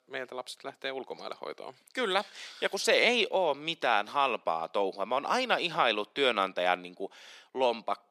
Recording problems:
thin; somewhat; fading below 550 Hz

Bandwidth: 15 kHz